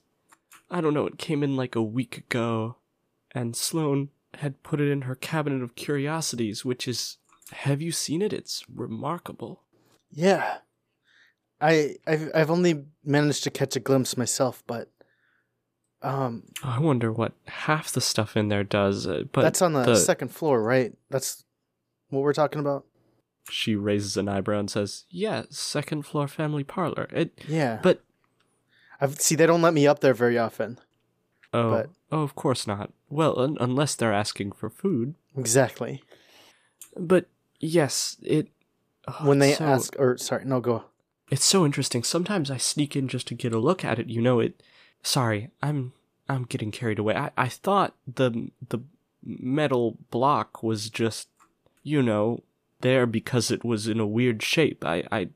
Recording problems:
none

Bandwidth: 15 kHz